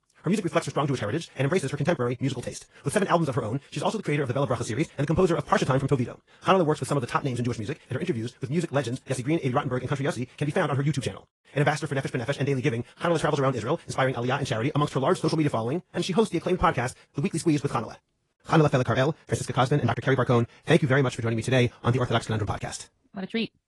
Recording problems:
wrong speed, natural pitch; too fast; 1.8 times normal speed
garbled, watery; slightly; nothing above 10.5 kHz

